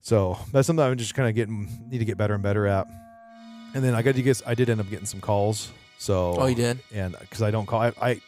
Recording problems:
background music; faint; throughout; 25 dB below the speech

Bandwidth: 15.5 kHz